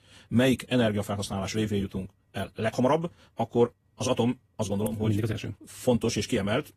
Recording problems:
wrong speed, natural pitch; too fast; 1.7 times normal speed
garbled, watery; slightly; nothing above 14.5 kHz

